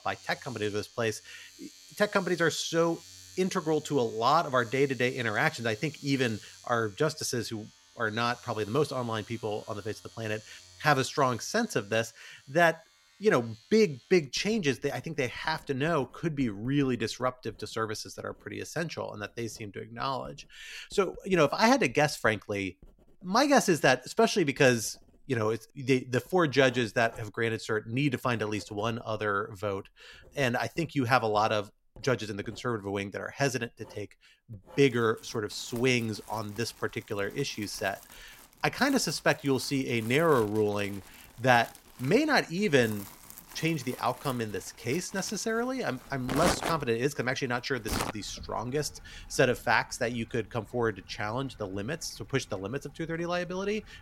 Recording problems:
household noises; noticeable; throughout; 15 dB below the speech

